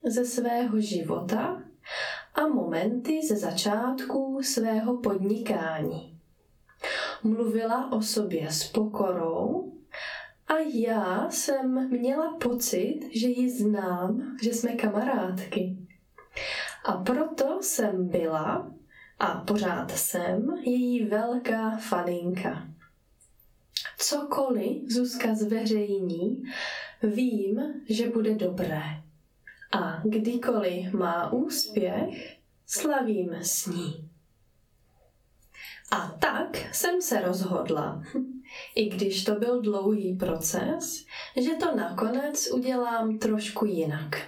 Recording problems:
off-mic speech; far
squashed, flat; heavily
room echo; very slight; dies away in 0.2 s

